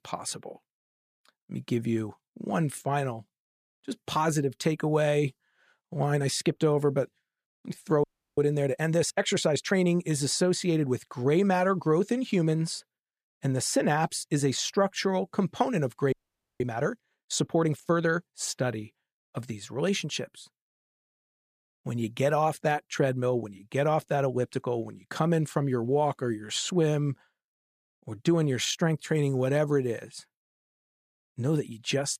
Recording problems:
audio freezing; at 8 s and at 16 s

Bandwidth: 14.5 kHz